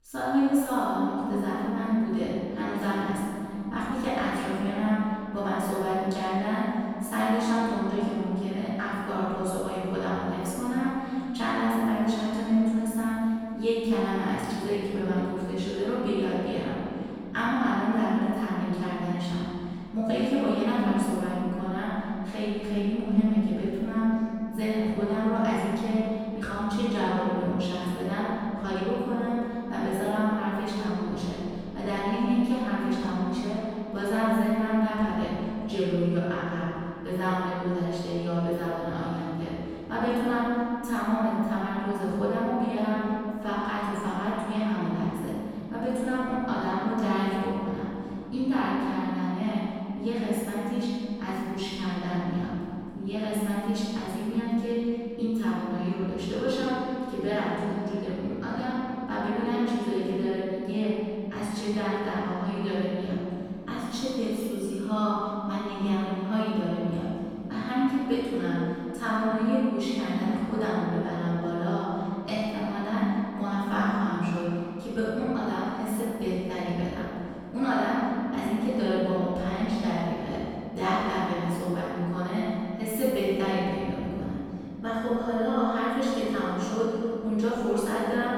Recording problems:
room echo; strong; dies away in 2.5 s
off-mic speech; far

